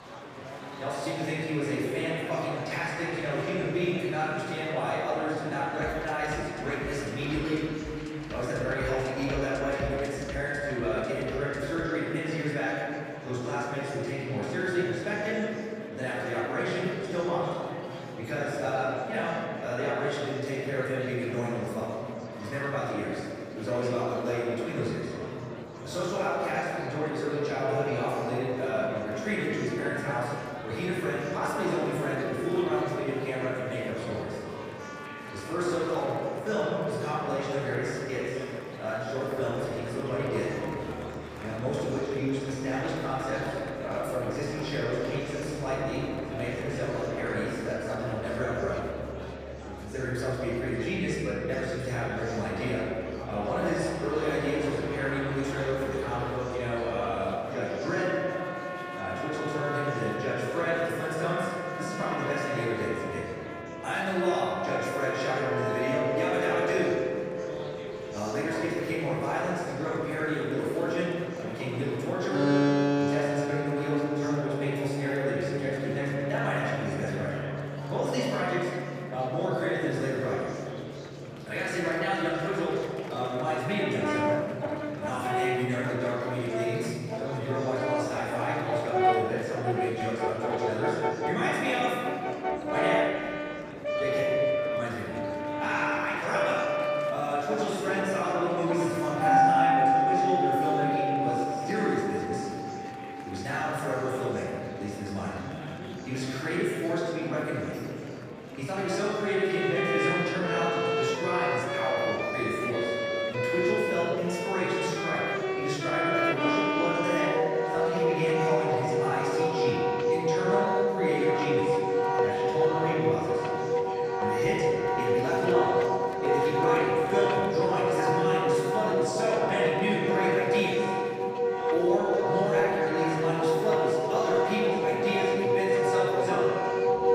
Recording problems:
room echo; strong; dies away in 2.4 s
off-mic speech; far
background music; very loud; throughout; 1 dB above the speech
murmuring crowd; noticeable; throughout; 10 dB below the speech

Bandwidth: 15 kHz